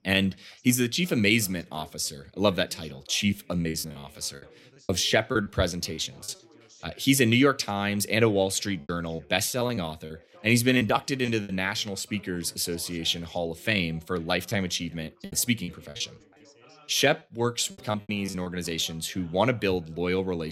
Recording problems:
background chatter; faint; throughout; 3 voices, 30 dB below the speech
choppy; very; from 3.5 to 6.5 s, from 9 to 11 s and from 14 to 18 s; 17% of the speech affected
abrupt cut into speech; at the end

